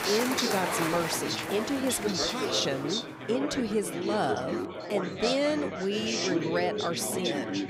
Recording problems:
chatter from many people; loud; throughout; 1 dB below the speech

